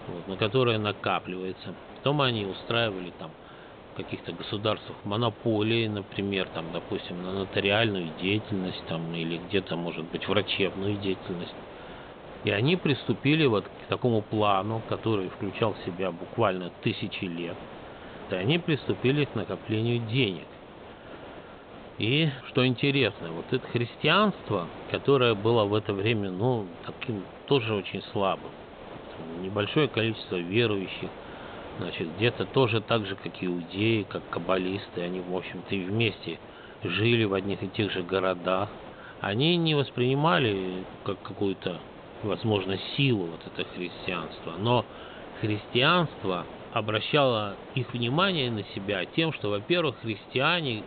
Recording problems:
high frequencies cut off; severe; nothing above 4 kHz
hiss; noticeable; throughout; 15 dB below the speech

